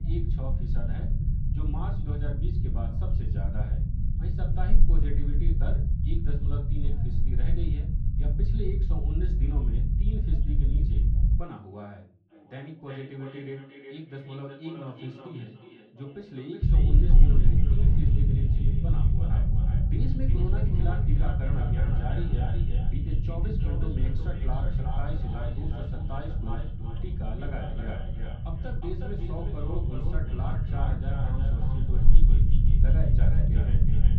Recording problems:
echo of what is said; strong; from 12 s on; 360 ms later, 7 dB below the speech
off-mic speech; far
muffled; slightly; fading above 3.5 kHz
room echo; very slight; dies away in 0.3 s
low rumble; very loud; until 11 s and from 17 s on; as loud as the speech
voice in the background; faint; throughout; 20 dB below the speech

